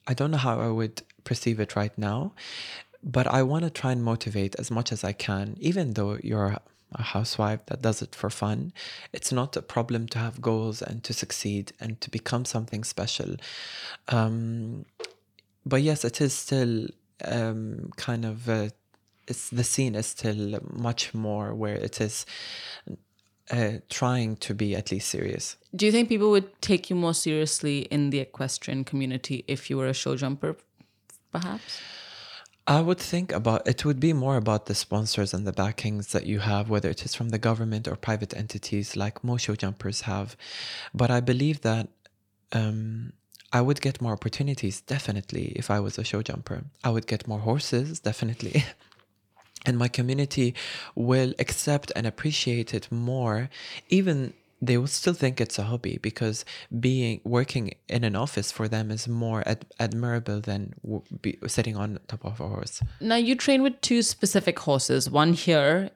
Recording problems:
none

